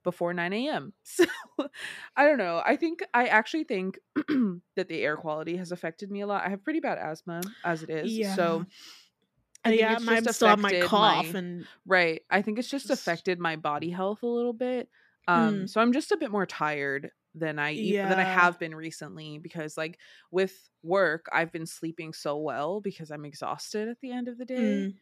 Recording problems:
none

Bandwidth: 14.5 kHz